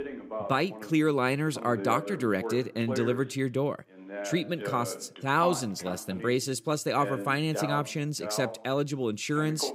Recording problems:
voice in the background; loud; throughout; 9 dB below the speech

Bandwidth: 15.5 kHz